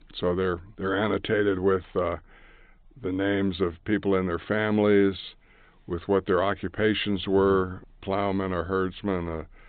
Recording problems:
high frequencies cut off; severe; nothing above 4 kHz

